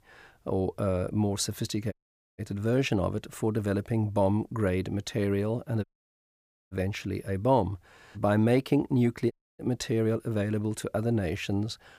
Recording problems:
audio cutting out; at 2 s, at 6 s for 1 s and at 9.5 s

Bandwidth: 15 kHz